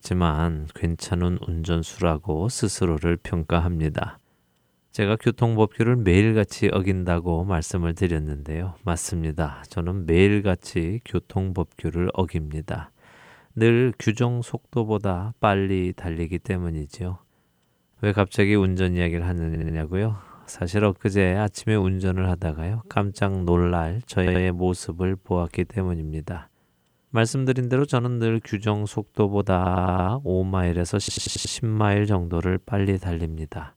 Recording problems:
audio stuttering; 4 times, first at 19 s

